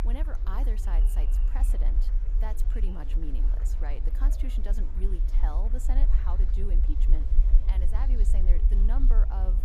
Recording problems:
low rumble; loud; throughout; 7 dB below the speech
murmuring crowd; noticeable; throughout; 10 dB below the speech
electrical hum; very faint; from 2.5 s on; 60 Hz, 30 dB below the speech

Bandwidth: 15 kHz